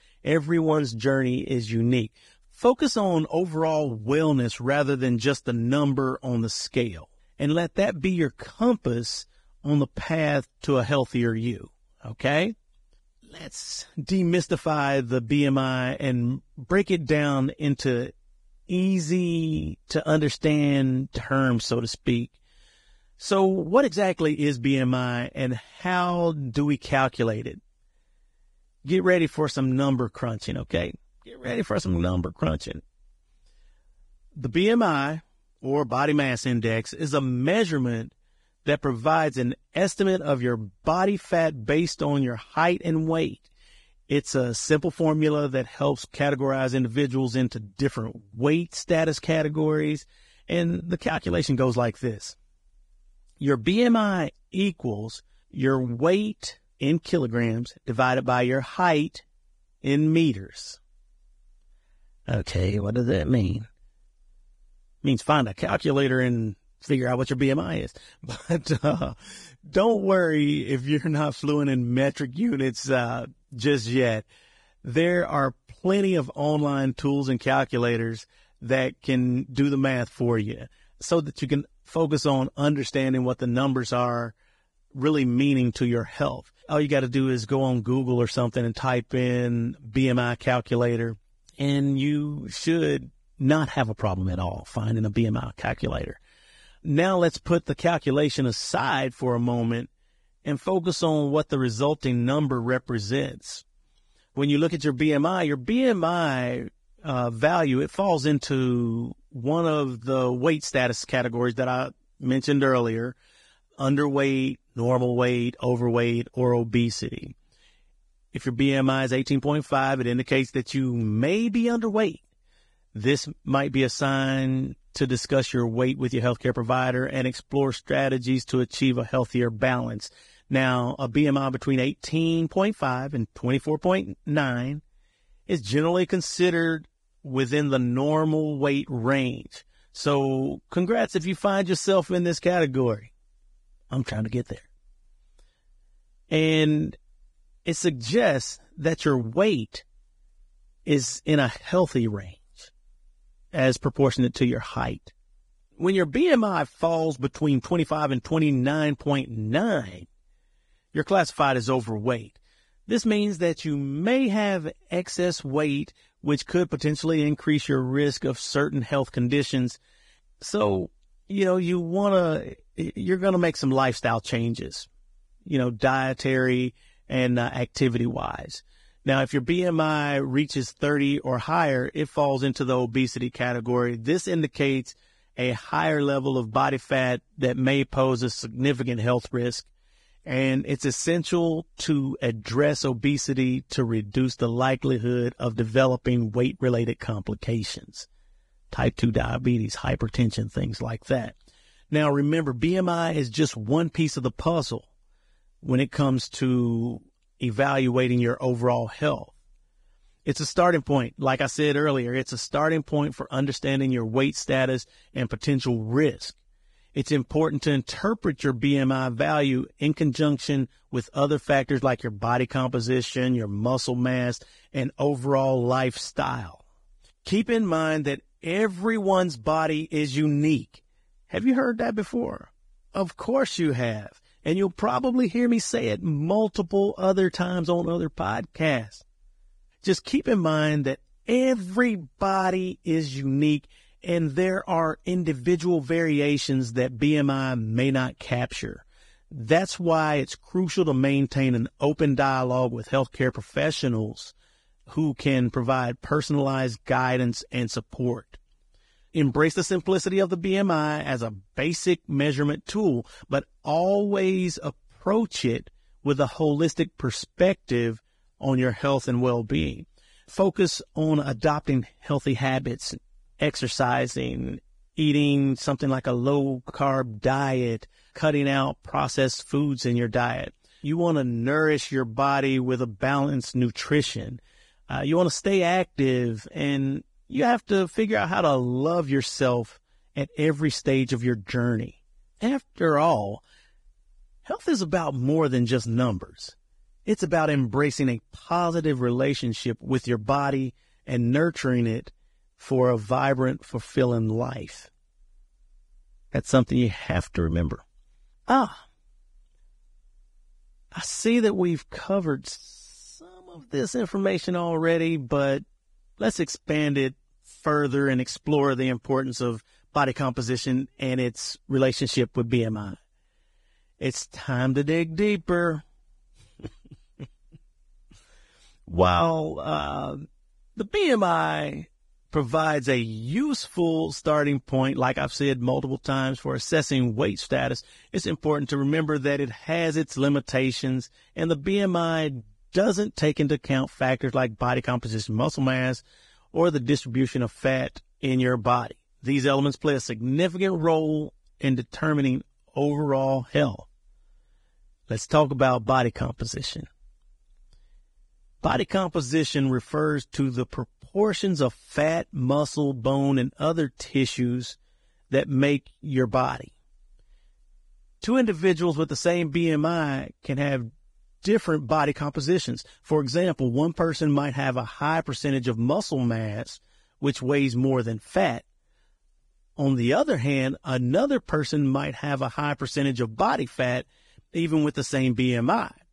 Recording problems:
garbled, watery; badly; nothing above 10 kHz

